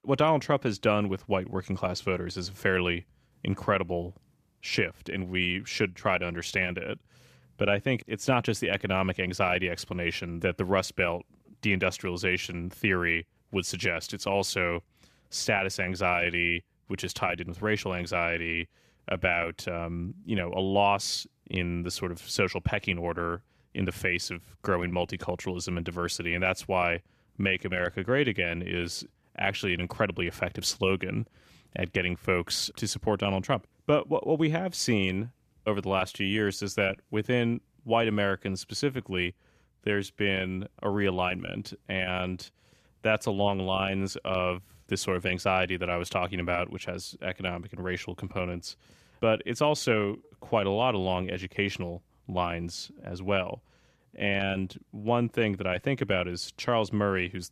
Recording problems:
none

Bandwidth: 14.5 kHz